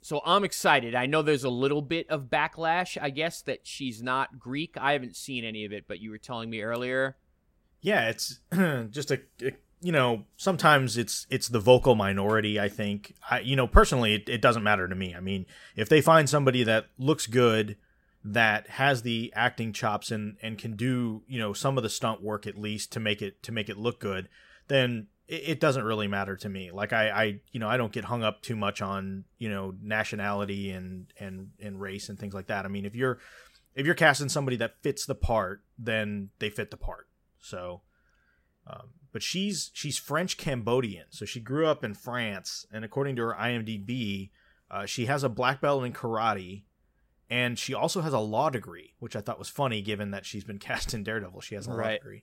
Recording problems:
none

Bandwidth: 16 kHz